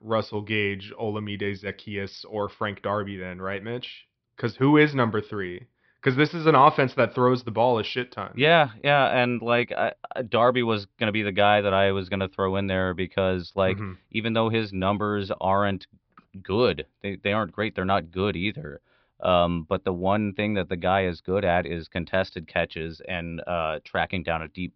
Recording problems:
high frequencies cut off; noticeable; nothing above 5.5 kHz

